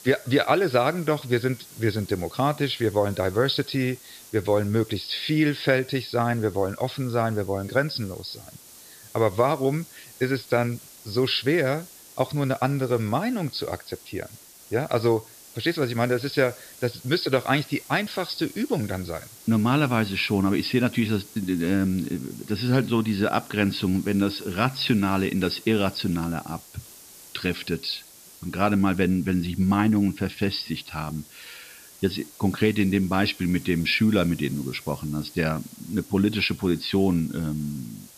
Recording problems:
high frequencies cut off; noticeable; nothing above 5.5 kHz
hiss; noticeable; throughout; 20 dB below the speech

